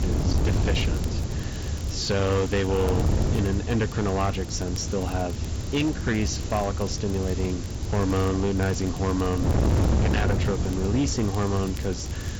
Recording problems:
distortion; heavy; 14% of the sound clipped
high frequencies cut off; noticeable; nothing above 7.5 kHz
garbled, watery; slightly
wind noise on the microphone; heavy; 8 dB below the speech
hiss; noticeable; throughout; 15 dB below the speech
crackle, like an old record; faint; 25 dB below the speech

